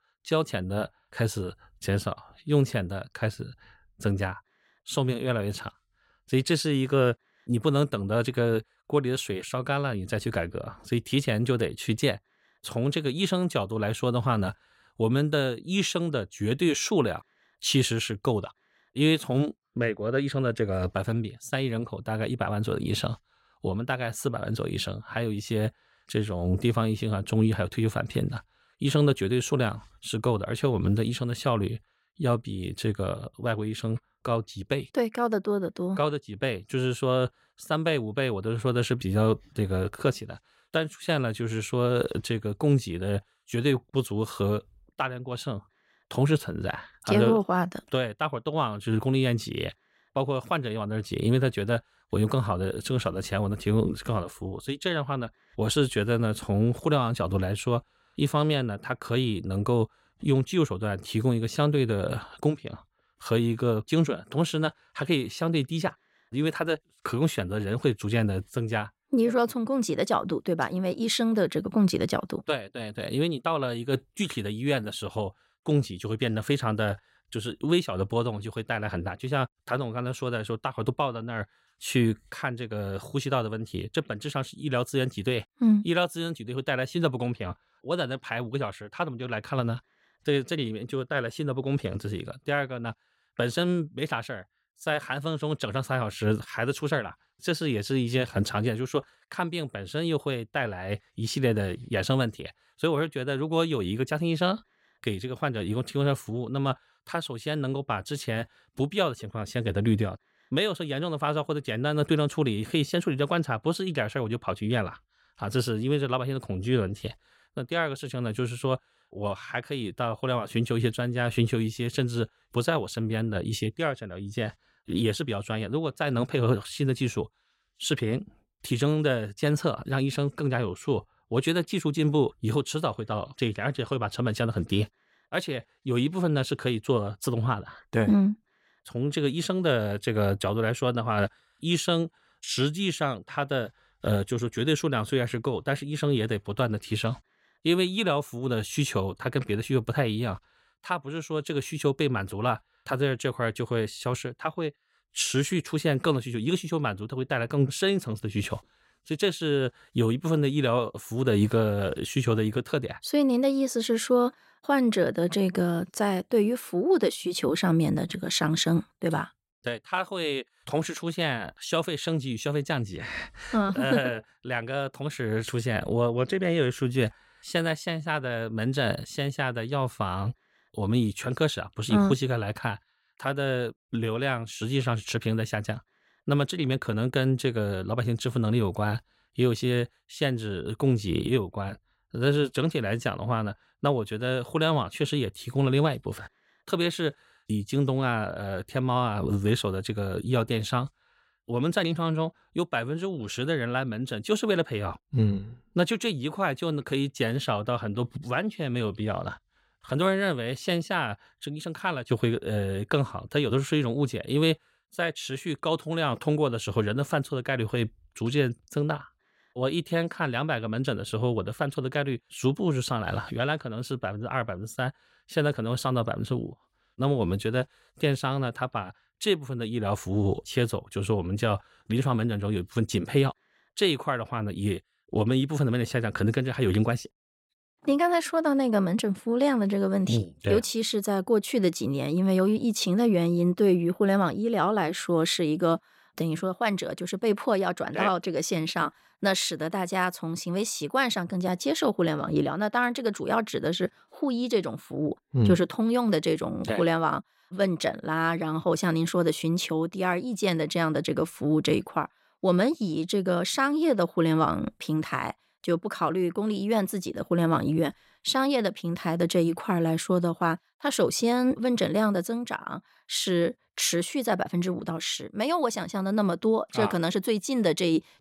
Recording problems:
none

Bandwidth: 16 kHz